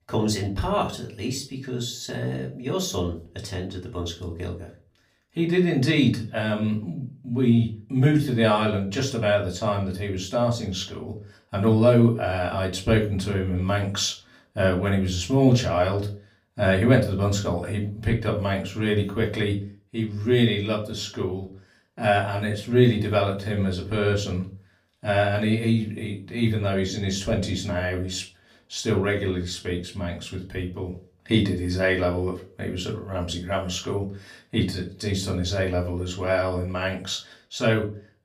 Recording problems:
off-mic speech; far
room echo; very slight; dies away in 0.3 s

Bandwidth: 15.5 kHz